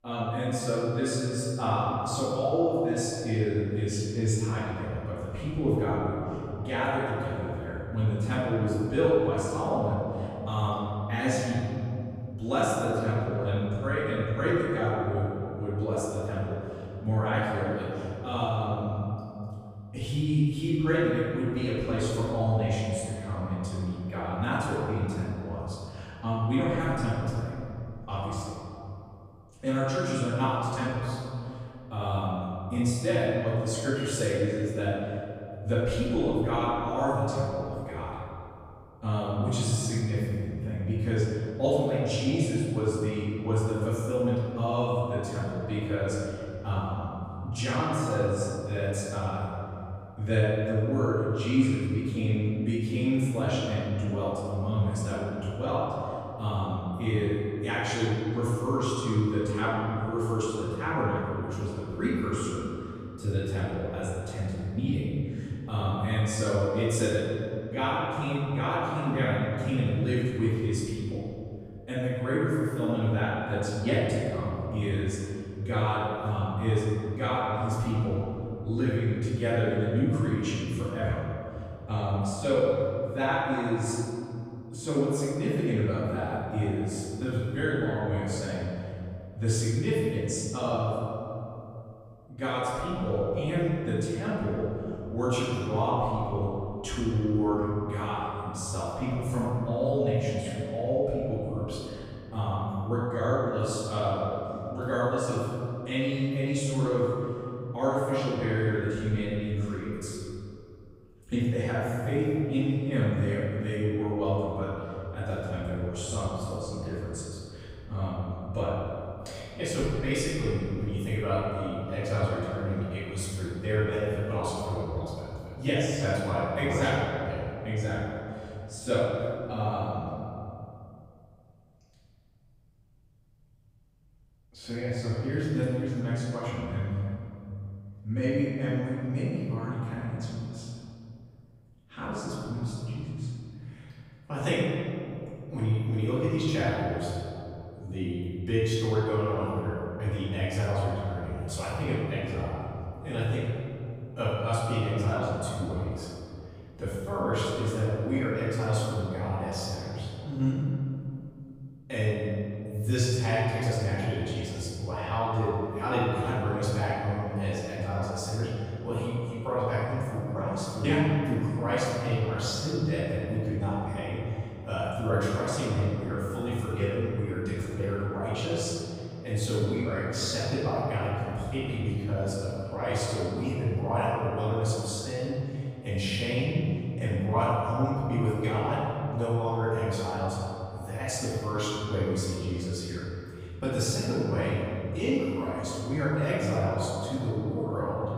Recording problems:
room echo; strong; dies away in 2.8 s
off-mic speech; far

